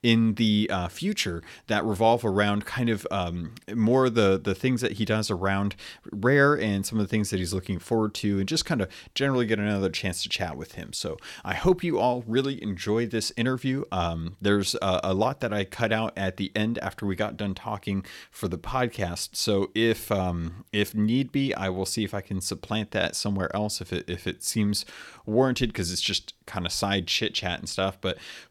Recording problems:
none

